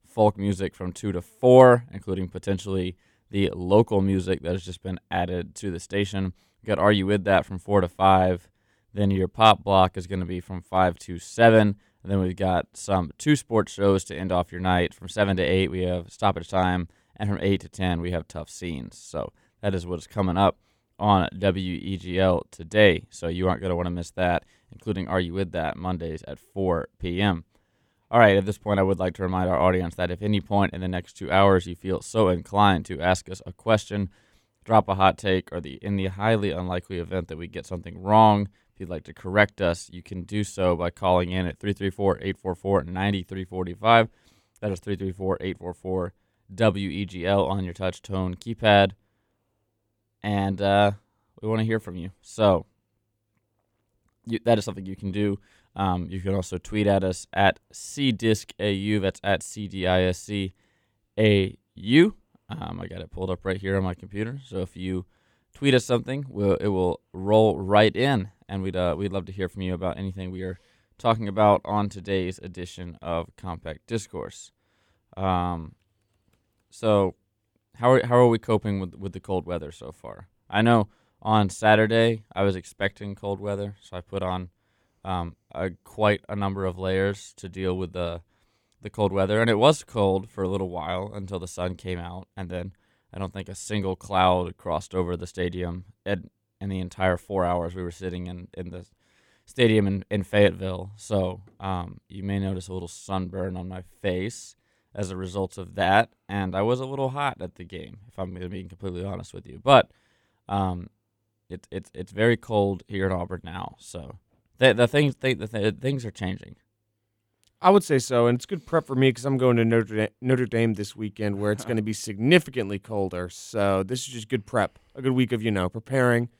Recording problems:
none

